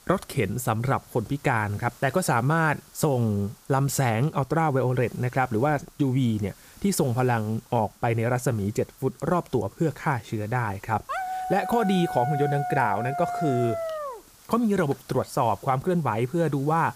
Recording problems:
hiss; faint; throughout; 25 dB below the speech
dog barking; noticeable; from 11 to 14 s; peak 4 dB below the speech

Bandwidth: 15 kHz